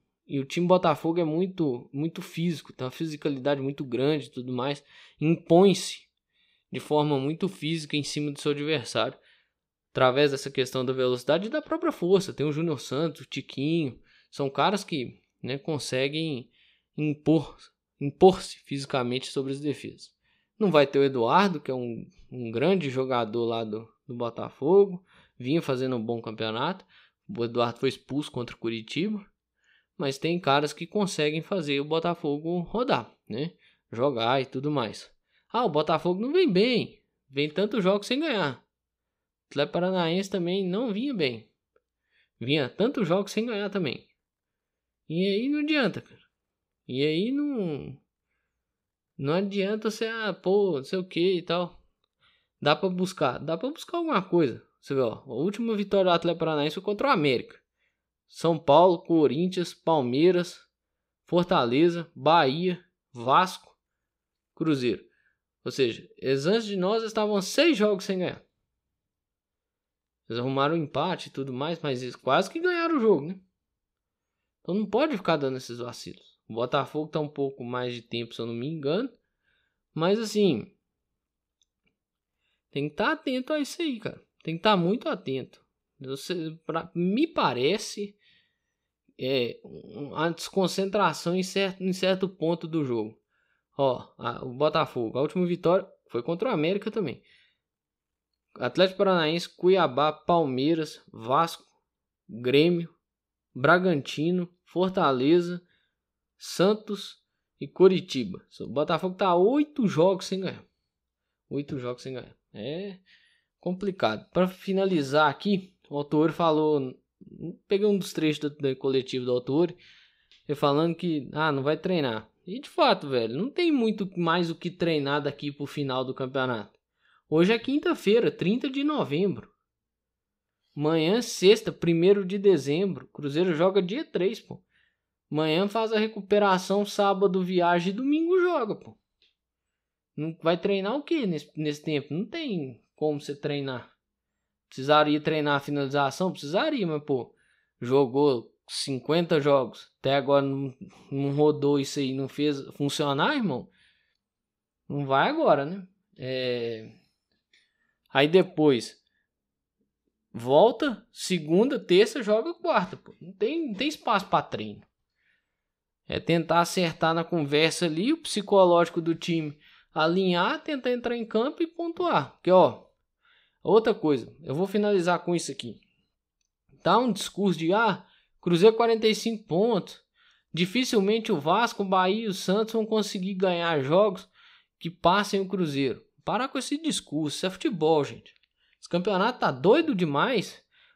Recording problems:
none

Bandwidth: 15.5 kHz